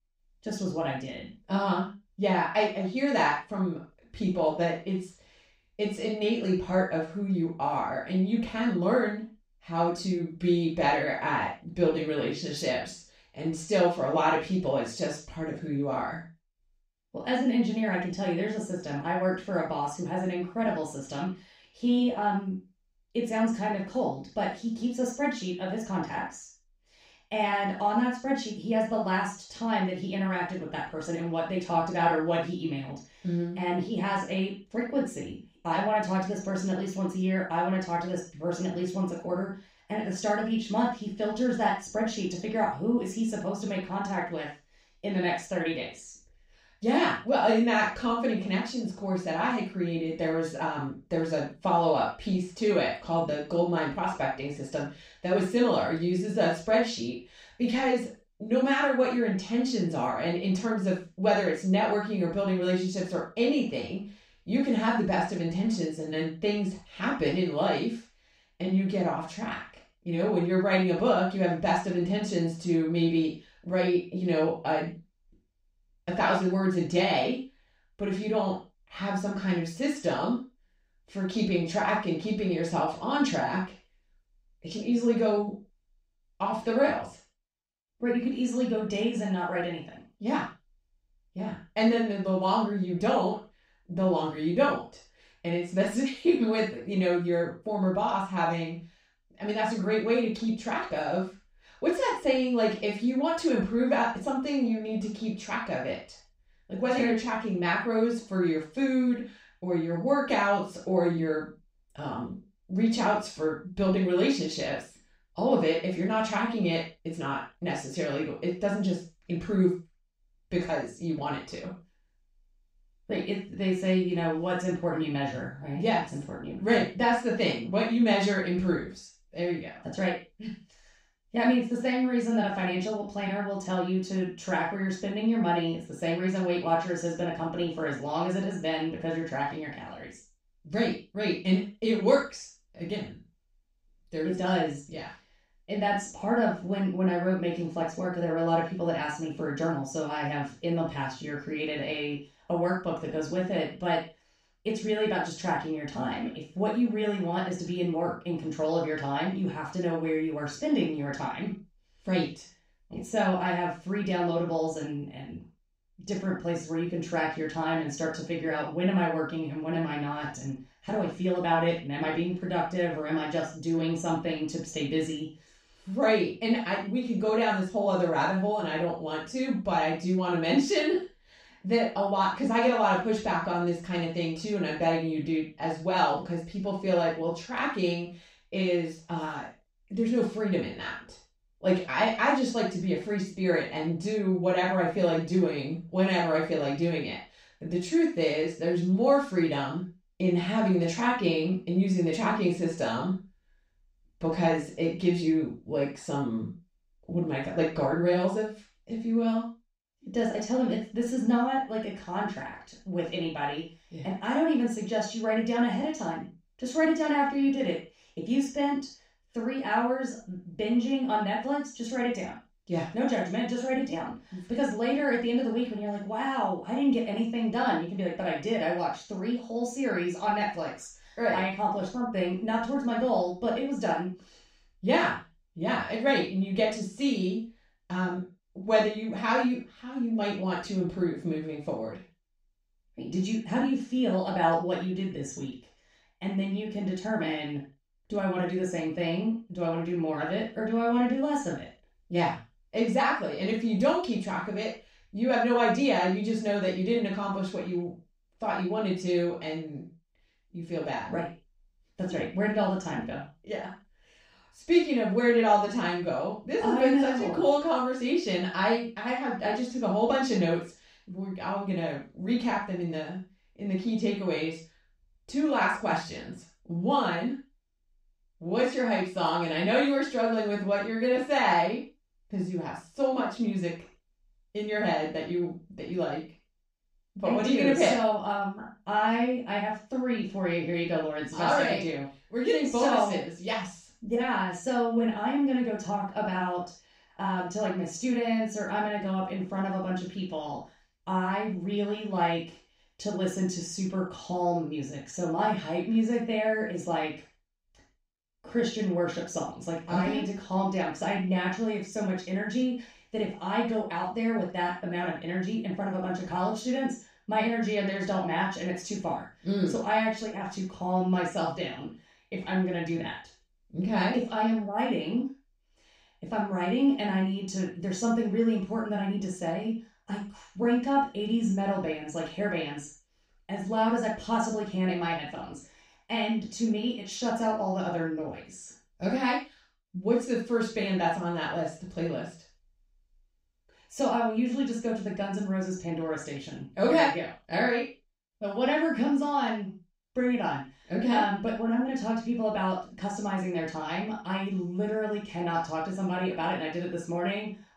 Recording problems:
off-mic speech; far
room echo; noticeable; dies away in 0.3 s

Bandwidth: 15.5 kHz